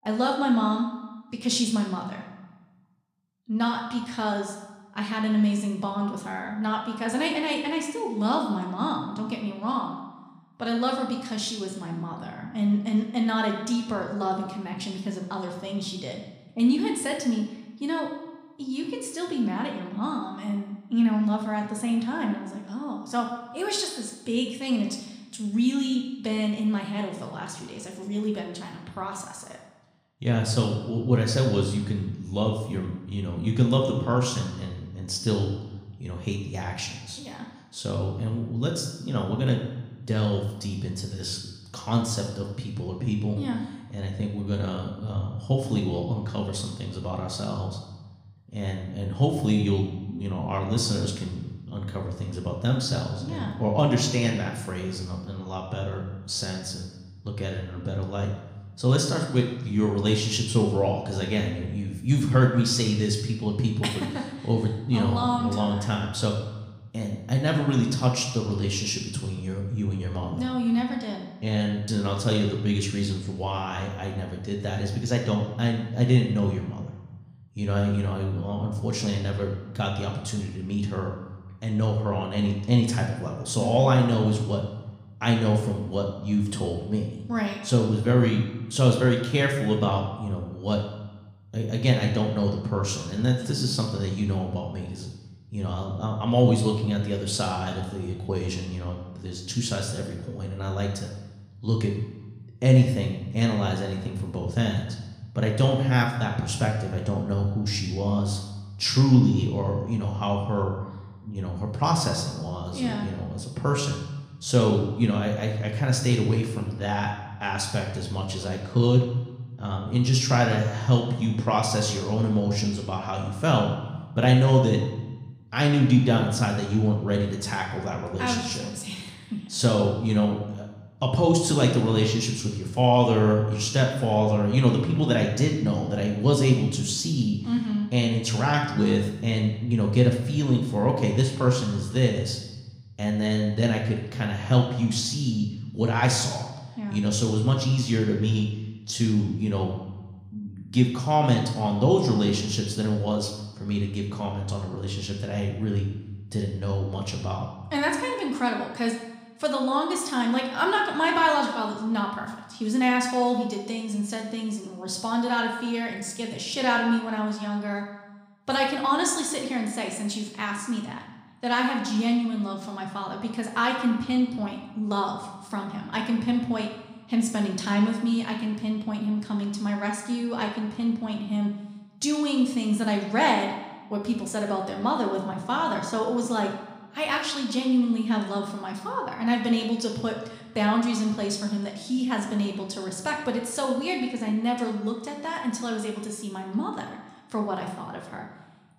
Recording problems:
room echo; noticeable; dies away in 0.9 s
off-mic speech; somewhat distant

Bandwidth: 15.5 kHz